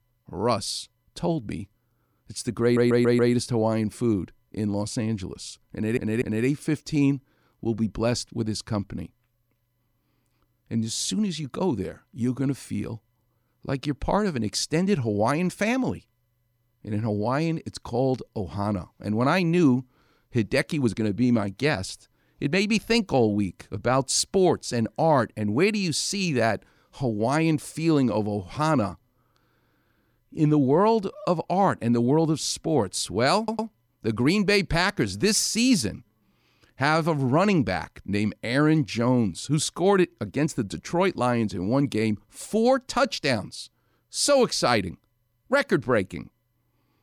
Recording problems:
audio stuttering; at 2.5 s, at 5.5 s and at 33 s

